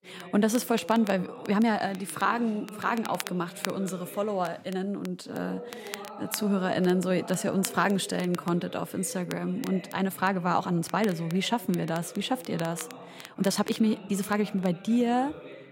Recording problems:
voice in the background; noticeable; throughout; 15 dB below the speech
crackle, like an old record; noticeable; 15 dB below the speech
uneven, jittery; strongly; from 1.5 to 15 s

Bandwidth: 16 kHz